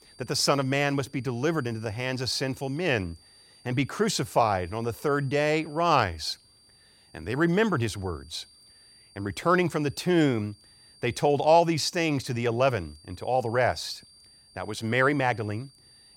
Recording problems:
high-pitched whine; faint; throughout; 4.5 kHz, 25 dB below the speech

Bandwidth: 16.5 kHz